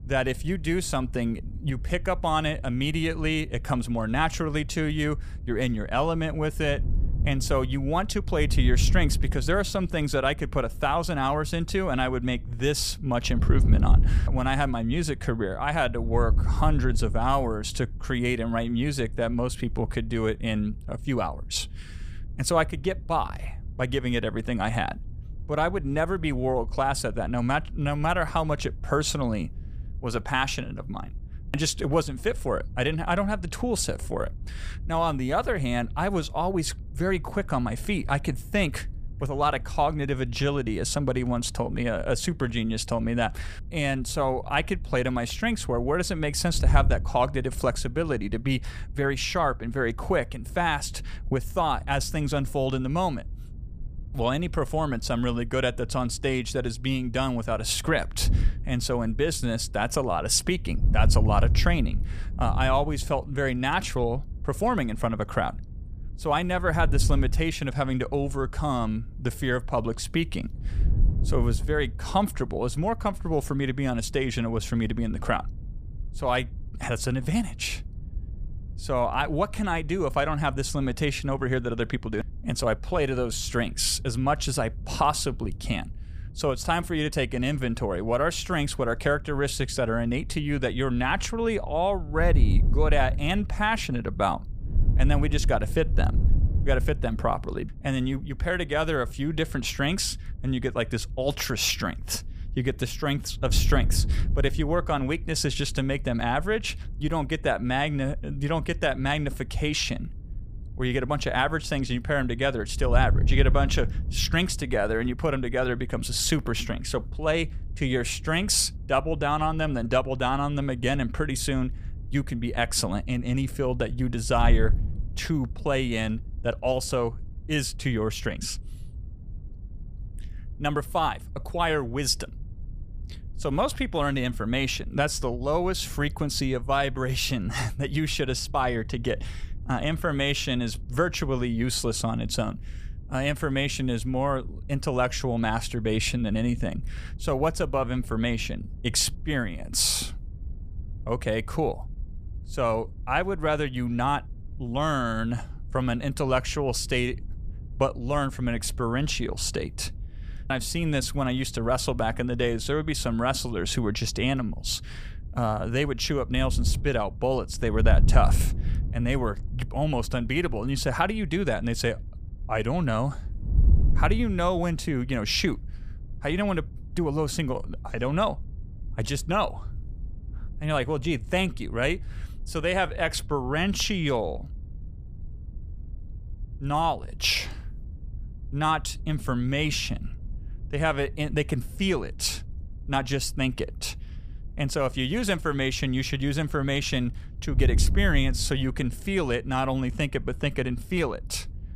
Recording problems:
wind noise on the microphone; occasional gusts; 25 dB below the speech

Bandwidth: 15 kHz